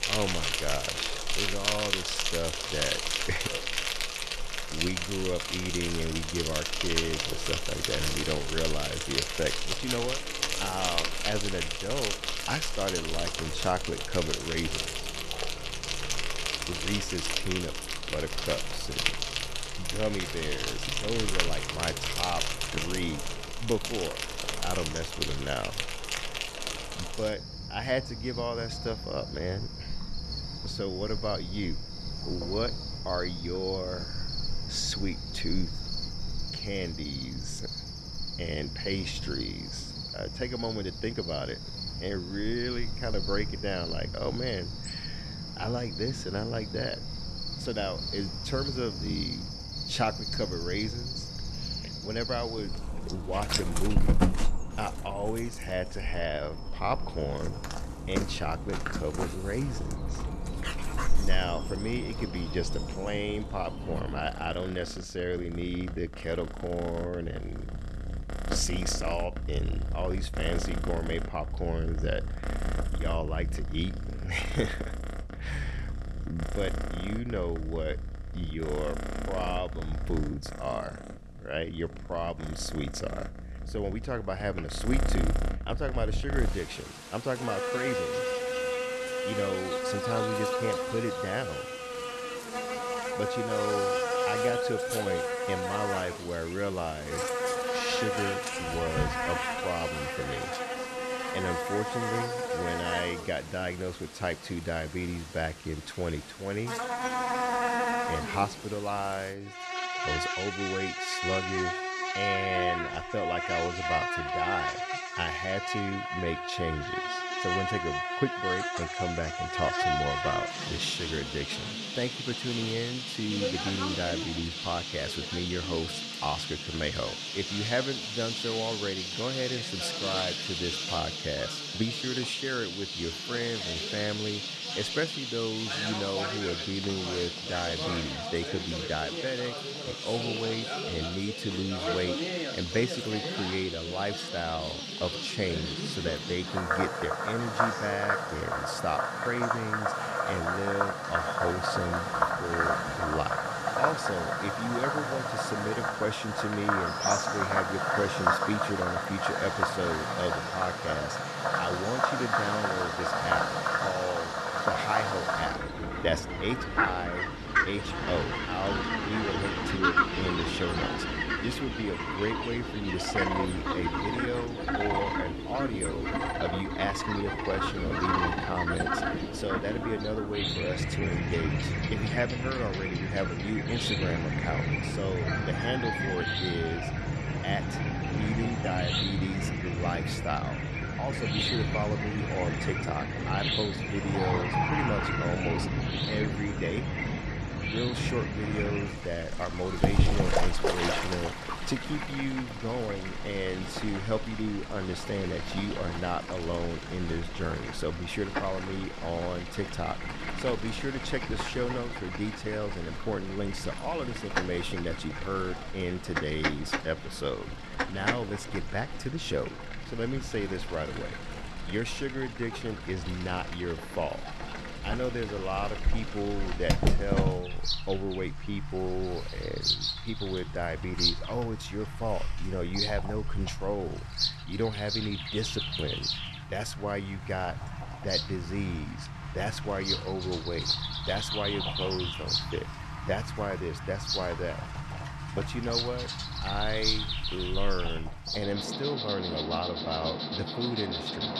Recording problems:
animal sounds; very loud; throughout; 2 dB above the speech

